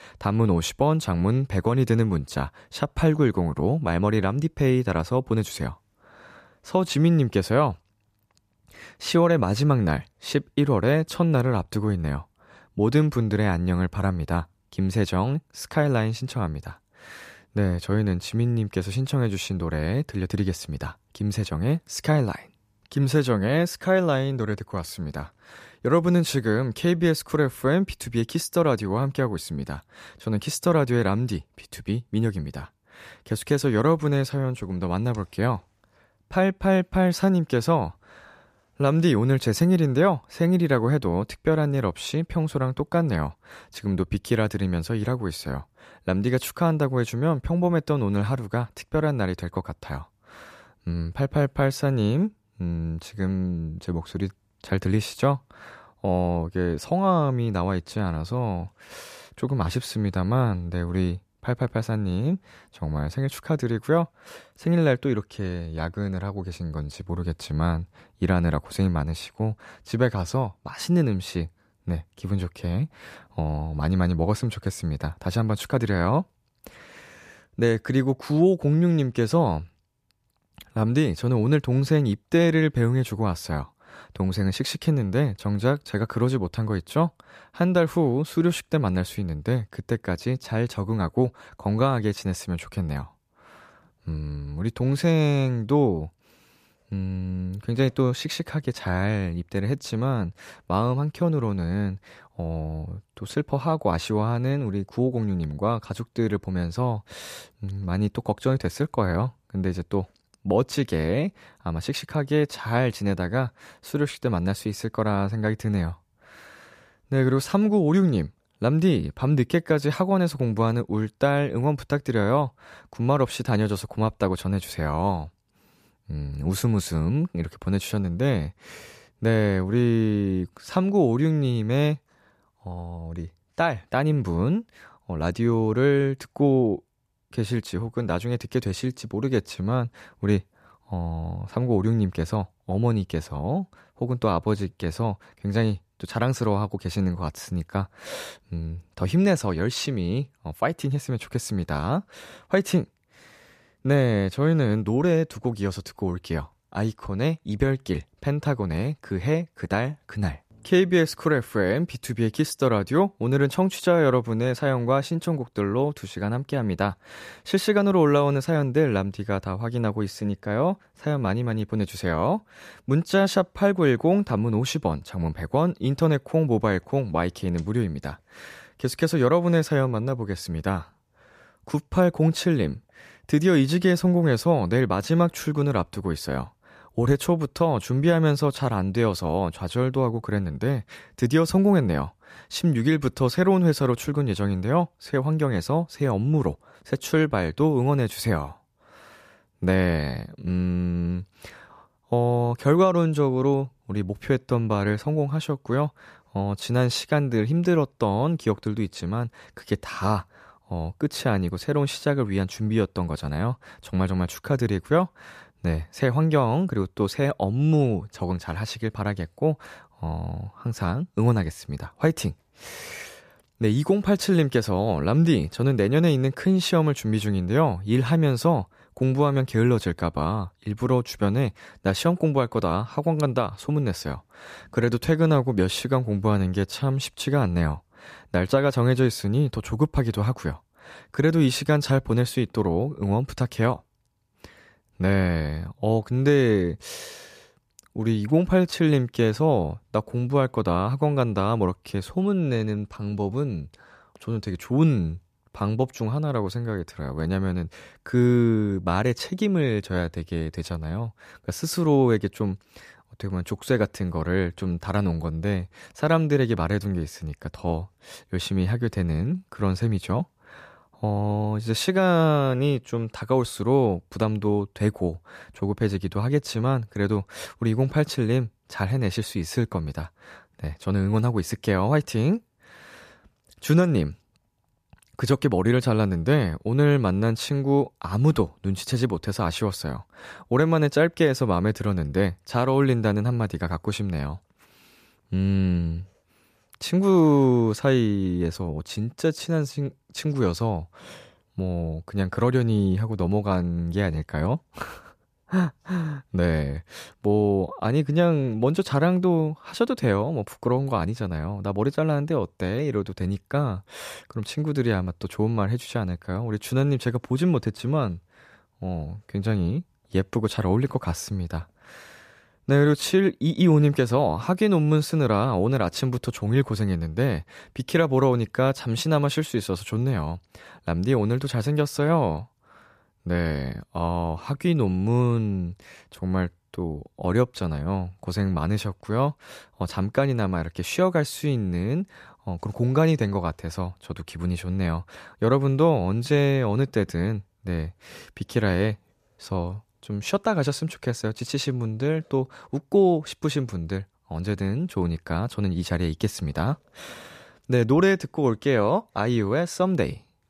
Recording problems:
none

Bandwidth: 14.5 kHz